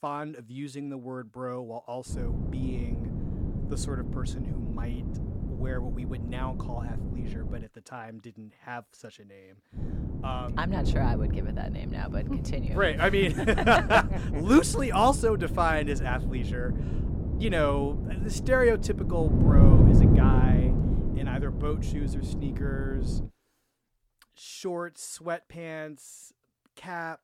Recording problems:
wind noise on the microphone; heavy; from 2 to 7.5 s and from 10 to 23 s; 9 dB below the speech

